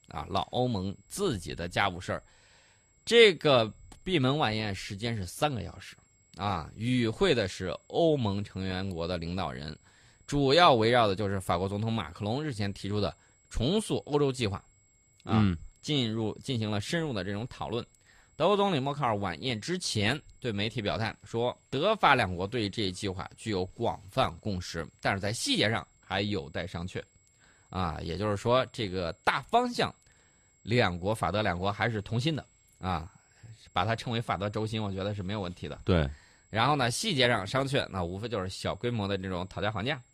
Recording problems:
high-pitched whine; faint; throughout; 7.5 kHz, 35 dB below the speech

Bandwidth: 14.5 kHz